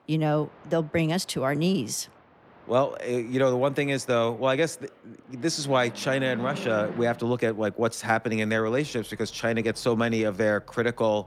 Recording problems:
train or aircraft noise; noticeable; throughout; 20 dB below the speech

